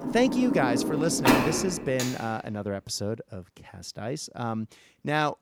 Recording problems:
household noises; very loud; until 1.5 s; 2 dB above the speech

